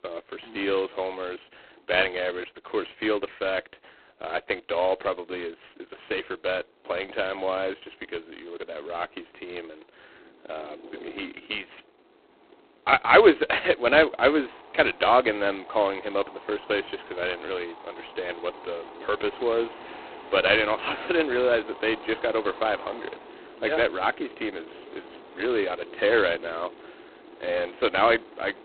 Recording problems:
phone-call audio; poor line; nothing above 4 kHz
wind in the background; noticeable; throughout; 20 dB below the speech

